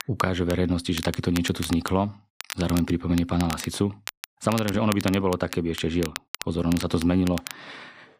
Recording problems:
crackle, like an old record; noticeable; 10 dB below the speech

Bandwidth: 15 kHz